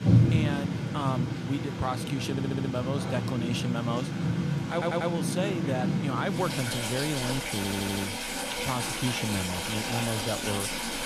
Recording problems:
rain or running water; very loud; throughout; 2 dB above the speech
audio stuttering; at 2.5 s, at 4.5 s and at 7.5 s

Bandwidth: 14 kHz